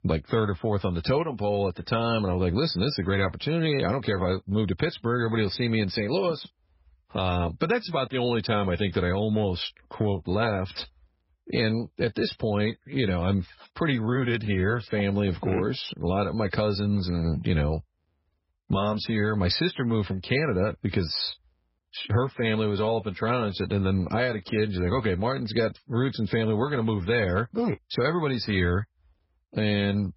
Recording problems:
garbled, watery; badly; nothing above 5.5 kHz

